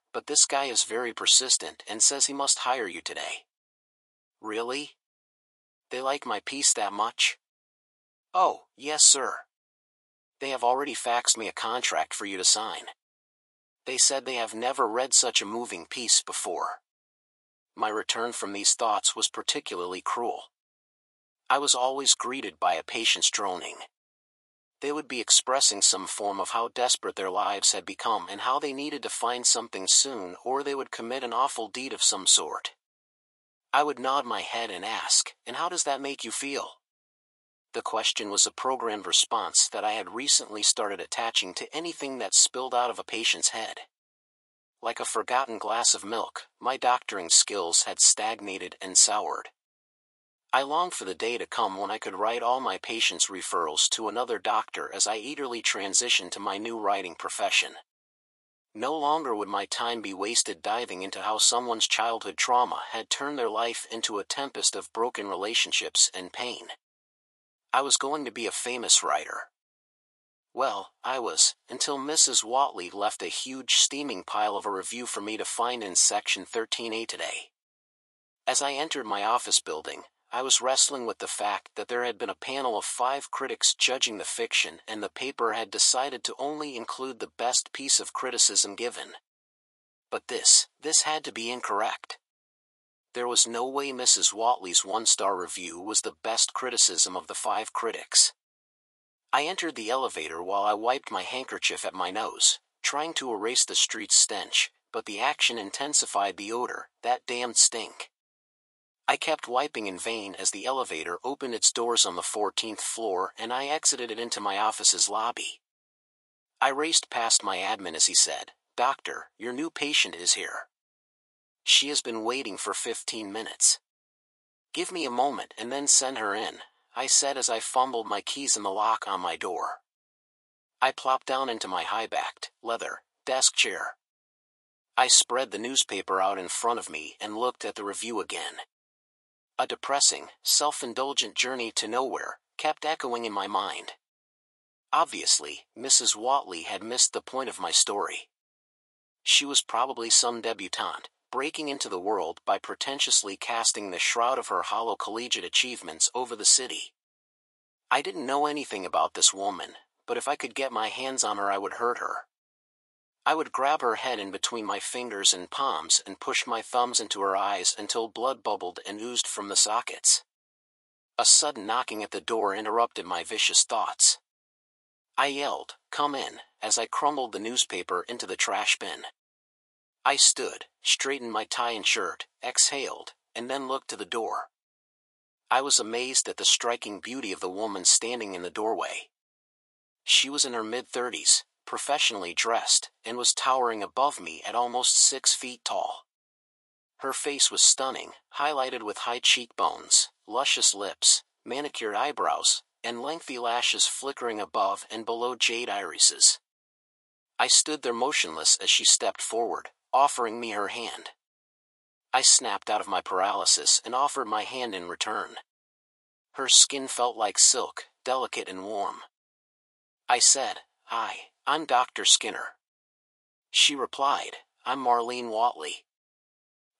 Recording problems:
thin; very; fading below 700 Hz

